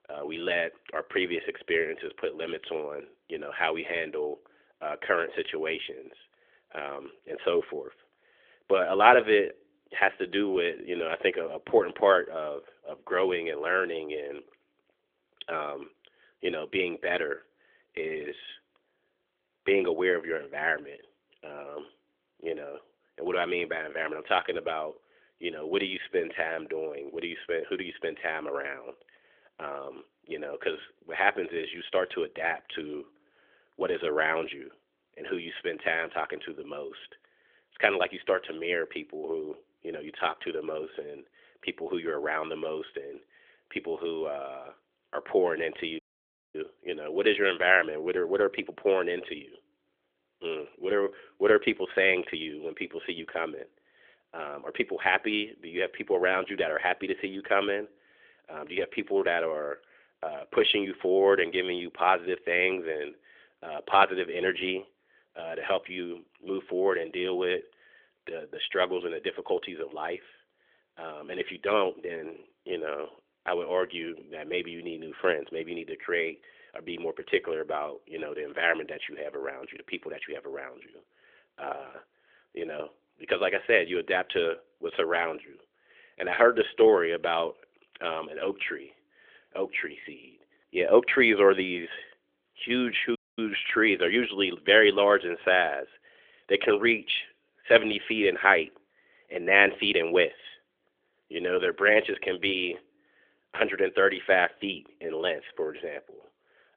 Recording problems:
phone-call audio; nothing above 3.5 kHz
audio cutting out; at 46 s for 0.5 s and at 1:33

